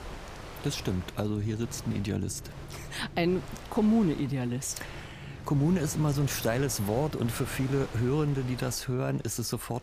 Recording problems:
wind noise on the microphone; occasional gusts; 10 dB below the speech
low rumble; faint; throughout; 20 dB below the speech

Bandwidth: 15 kHz